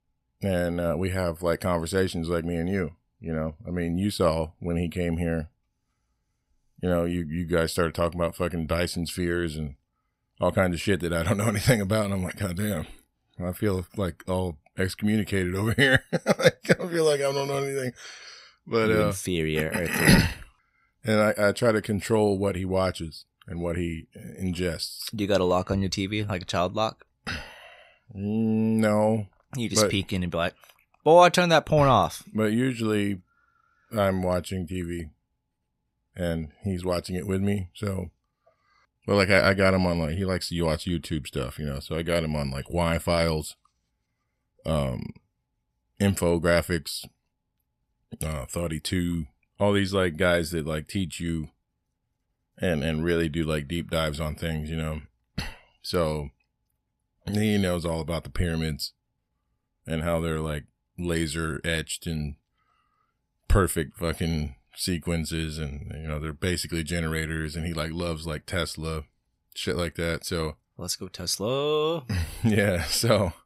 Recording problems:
none

